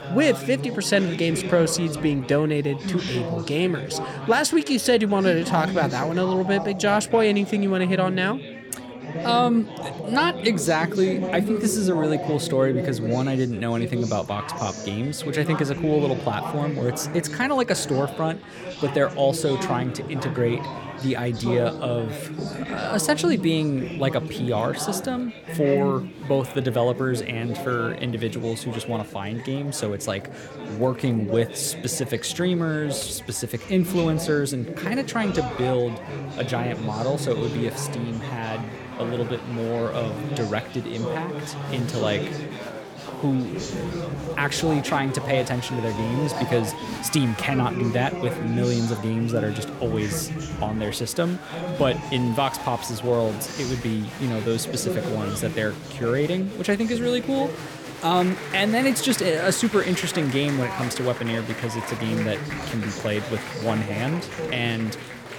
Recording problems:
chatter from many people; loud; throughout; 7 dB below the speech

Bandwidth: 17.5 kHz